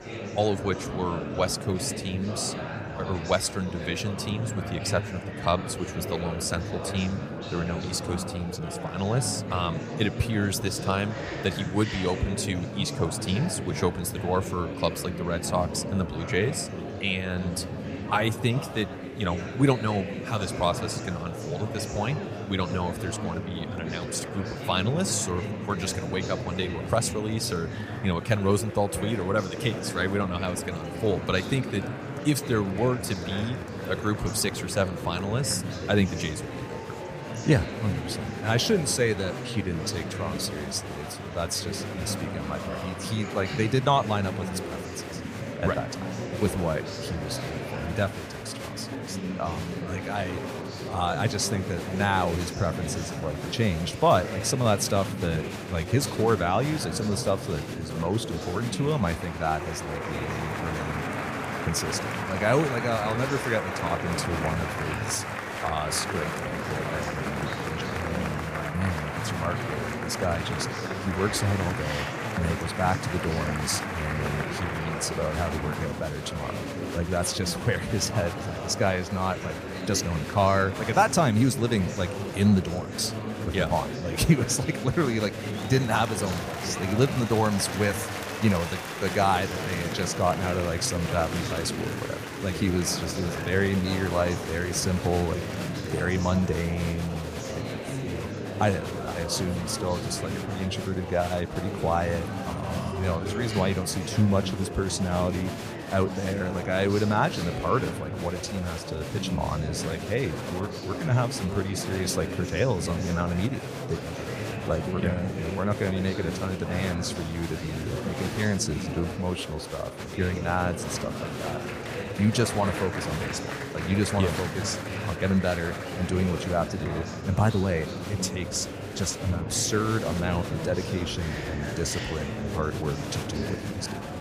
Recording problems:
murmuring crowd; loud; throughout; 5 dB below the speech

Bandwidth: 15 kHz